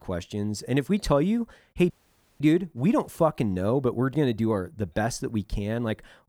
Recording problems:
audio cutting out; at 2 s for 0.5 s

